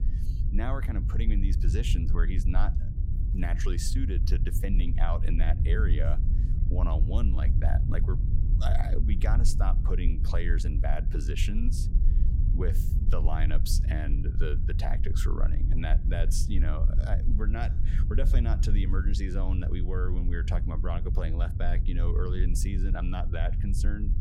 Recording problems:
low rumble; loud; throughout; 7 dB below the speech

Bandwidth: 16 kHz